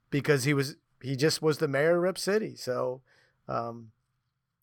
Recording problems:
none

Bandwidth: 18.5 kHz